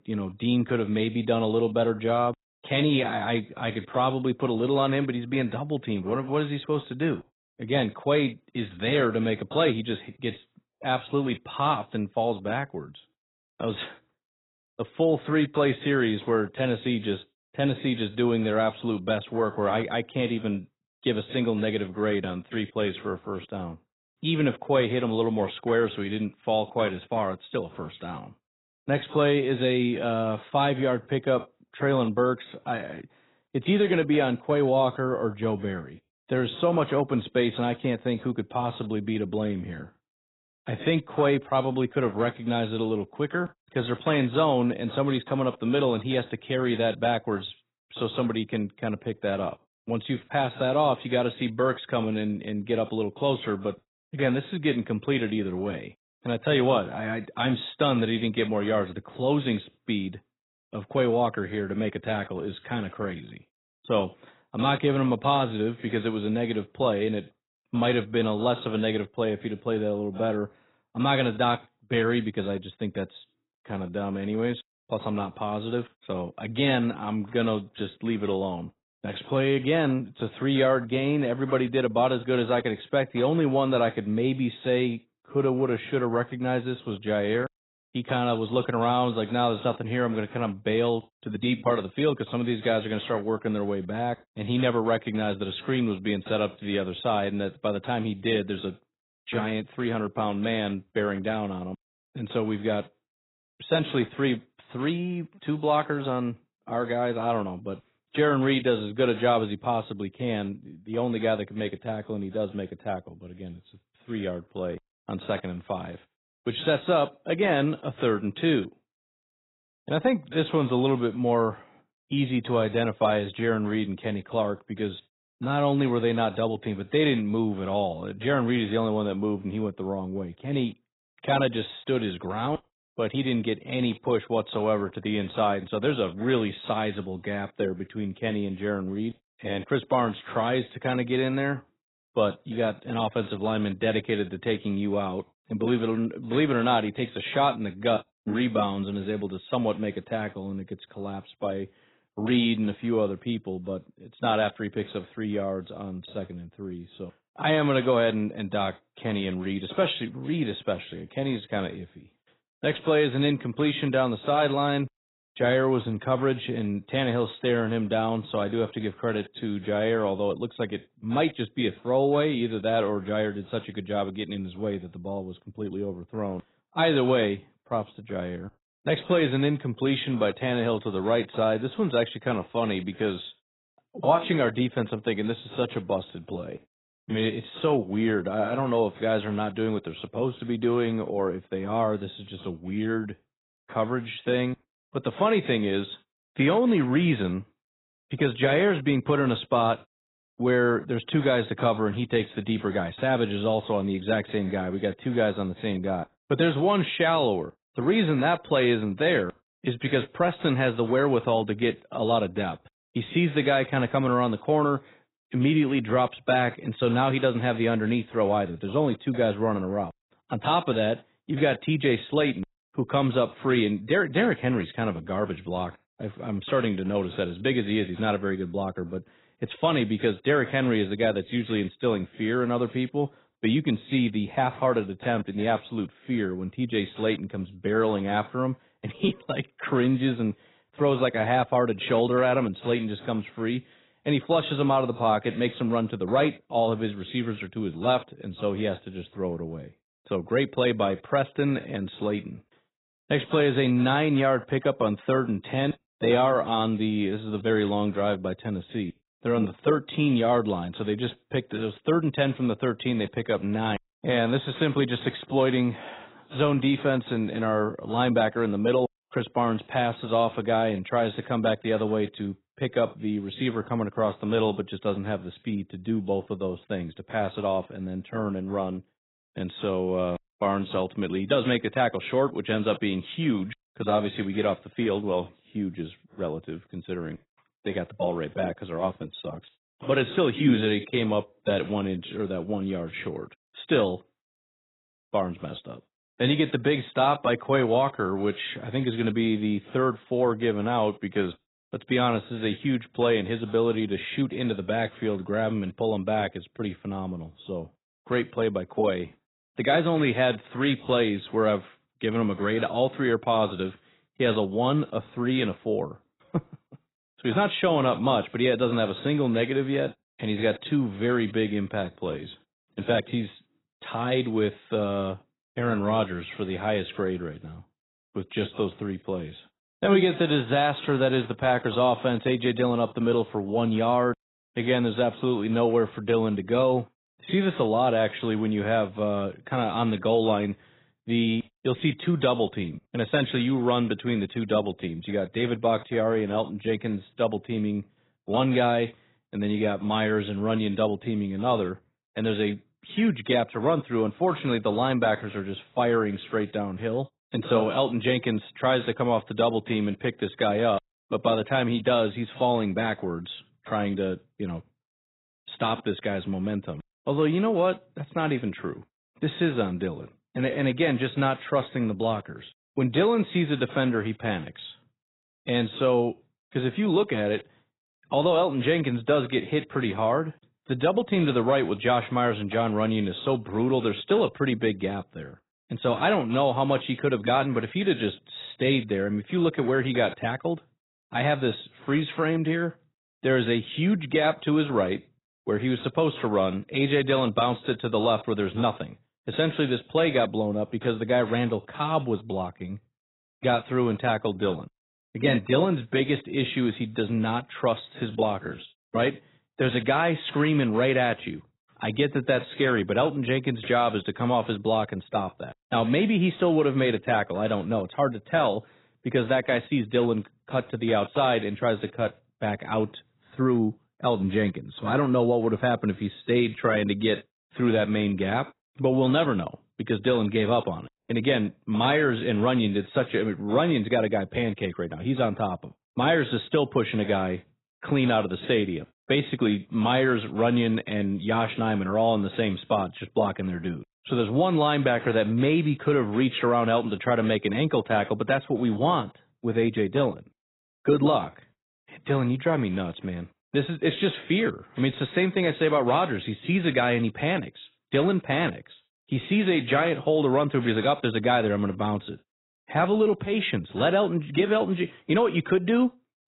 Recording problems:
garbled, watery; badly; nothing above 4 kHz

